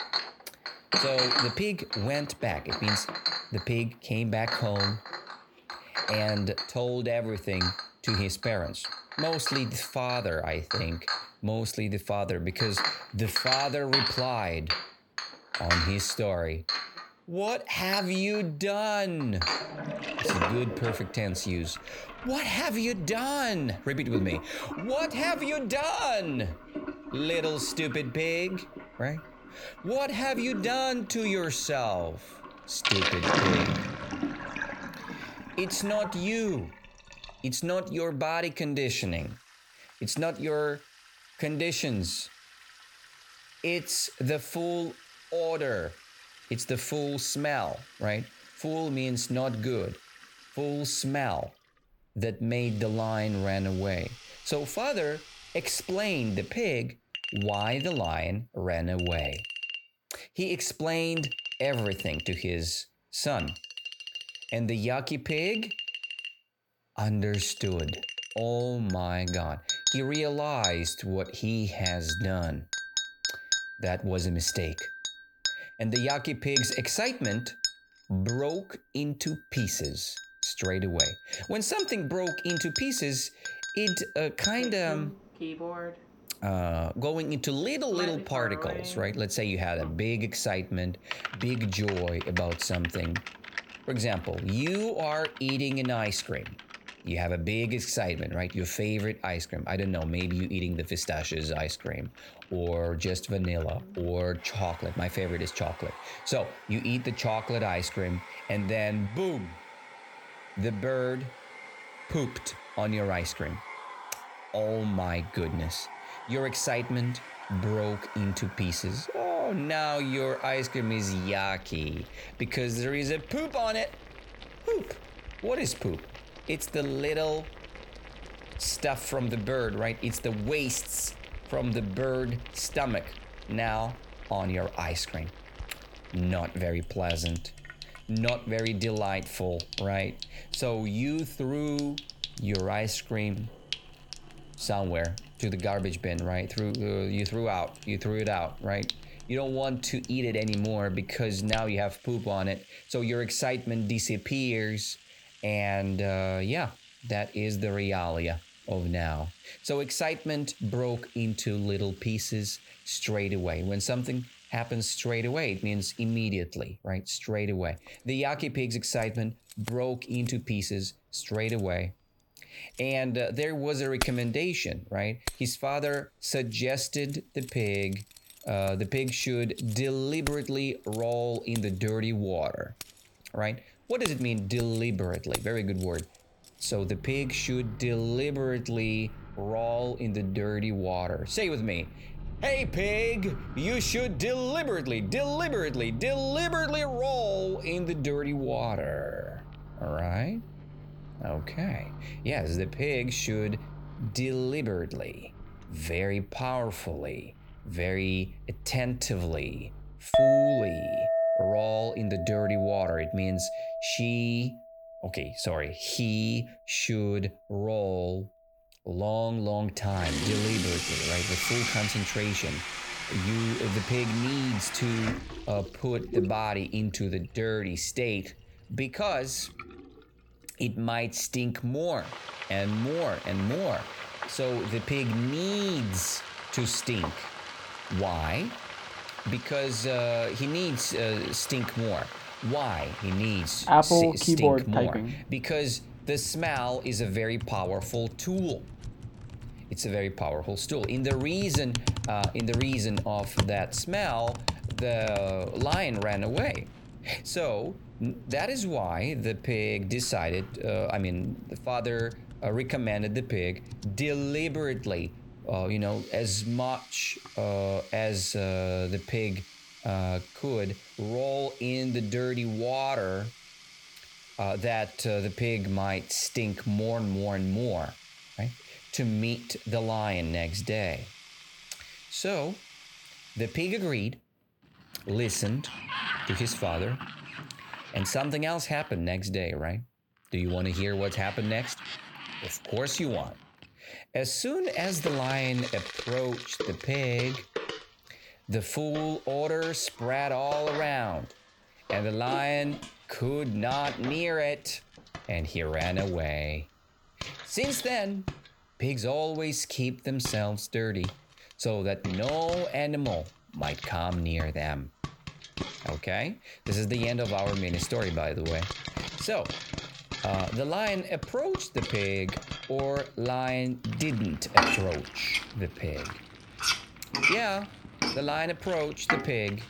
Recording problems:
household noises; loud; throughout; 4 dB below the speech

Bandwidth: 18 kHz